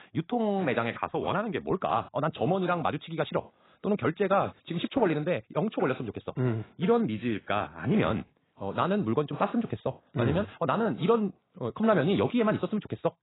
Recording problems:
garbled, watery; badly; nothing above 4 kHz
wrong speed, natural pitch; too fast; 1.5 times normal speed

